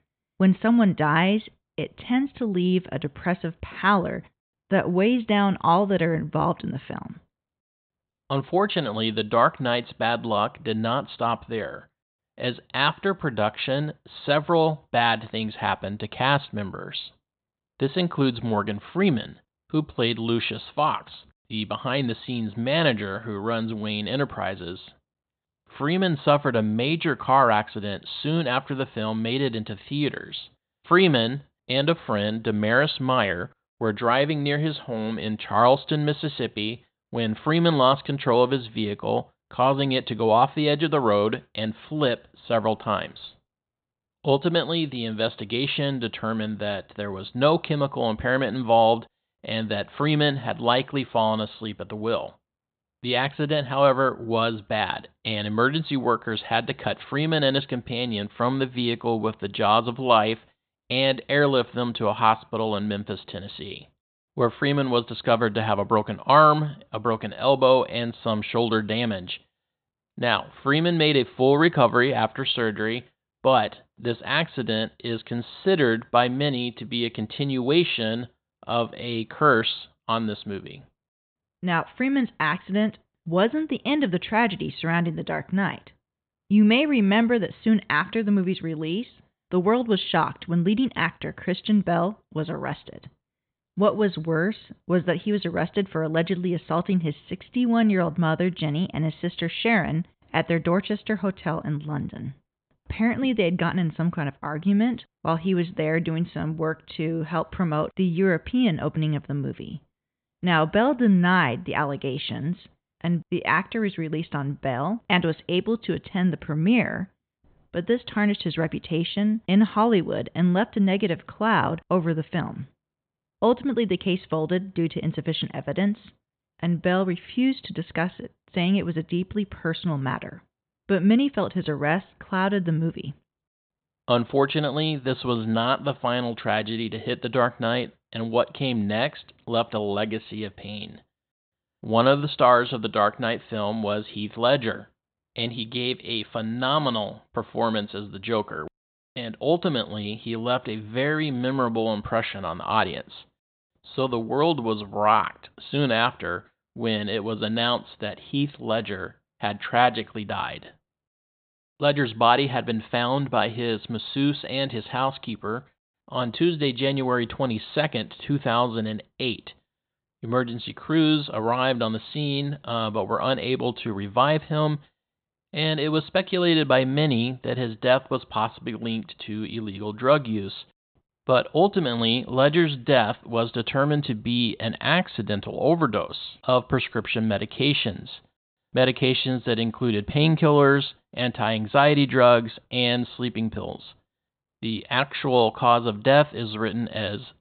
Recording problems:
high frequencies cut off; severe; nothing above 4 kHz

